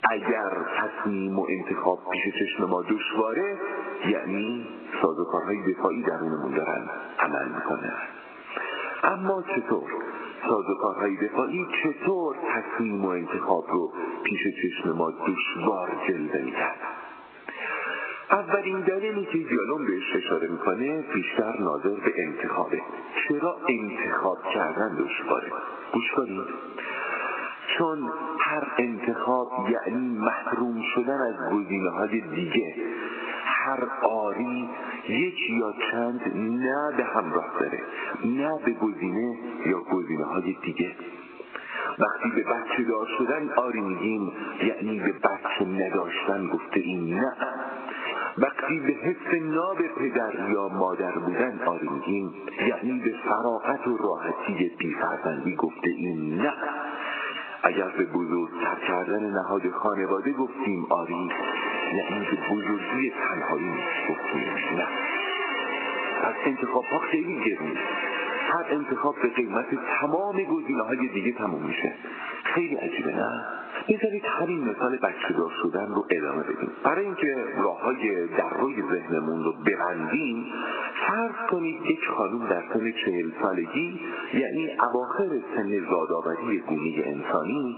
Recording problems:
echo of what is said; strong; throughout; 200 ms later, 10 dB below the speech
garbled, watery; badly
squashed, flat; heavily
phone-call audio; nothing above 2.5 kHz
door banging; loud; from 1:01 to 1:10; peak 3 dB above the speech

